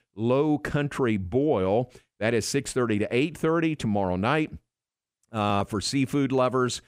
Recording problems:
none

